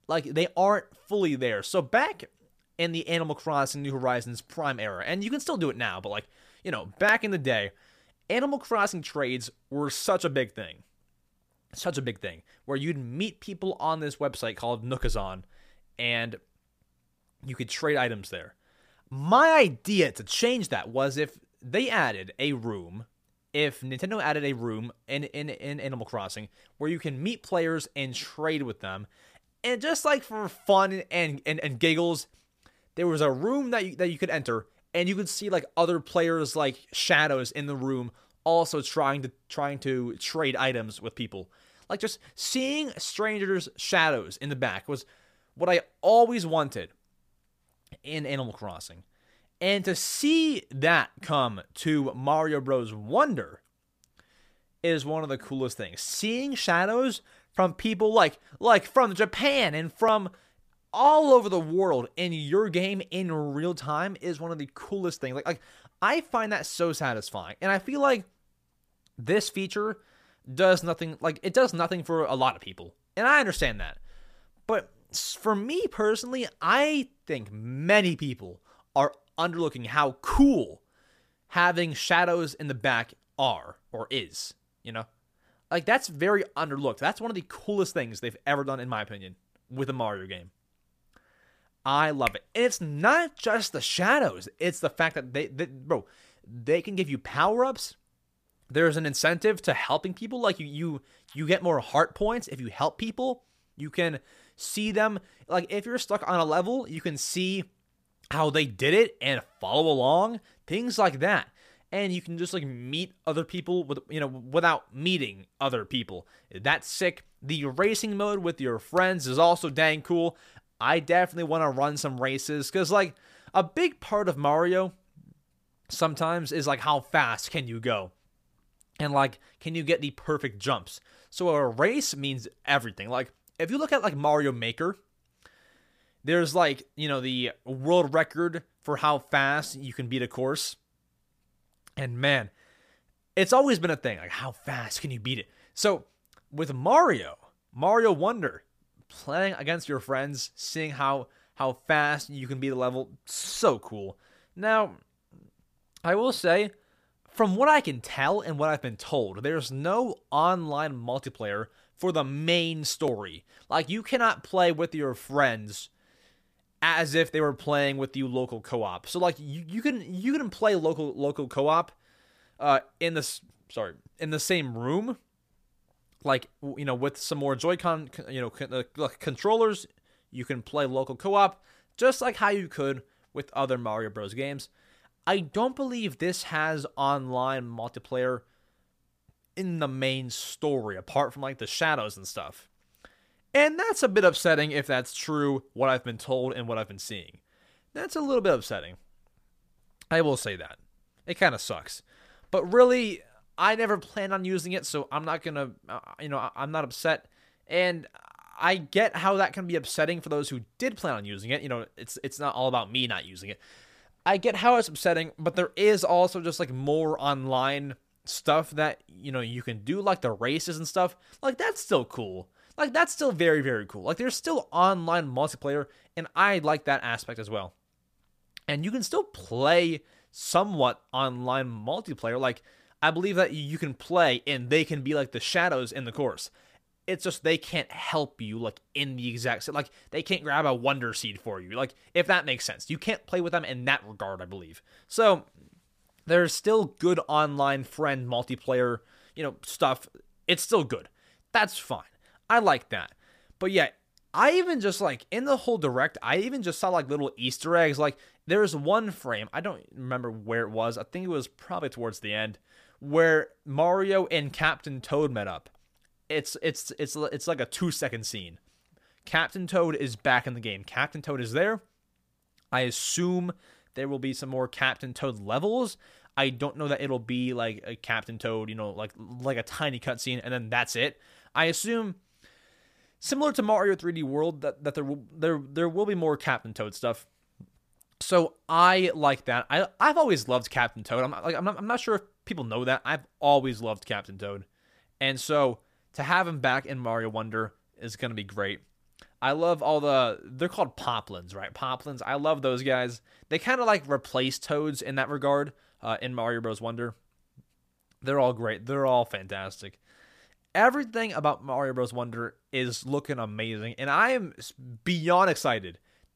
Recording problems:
none

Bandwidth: 15 kHz